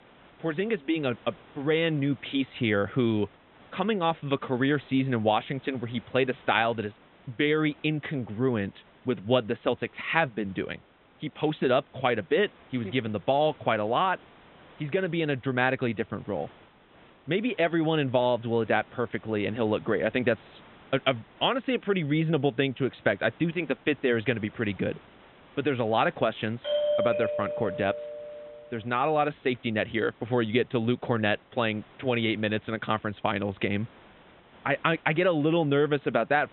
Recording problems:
high frequencies cut off; severe; nothing above 3.5 kHz
hiss; faint; throughout; 25 dB below the speech
doorbell; loud; from 27 to 28 s; peak 2 dB above the speech

